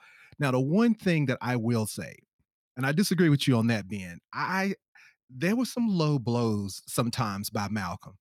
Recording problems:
none

